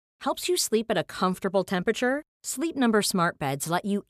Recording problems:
none

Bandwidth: 14.5 kHz